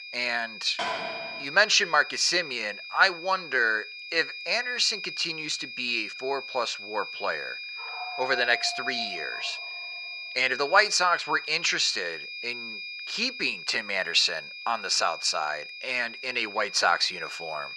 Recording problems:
thin; very; fading below 850 Hz
muffled; very slightly; fading above 3 kHz
high-pitched whine; noticeable; throughout; 2.5 kHz, 10 dB below the speech
door banging; noticeable; at 1 s; peak 5 dB below the speech
dog barking; faint; from 8 to 10 s; peak 10 dB below the speech

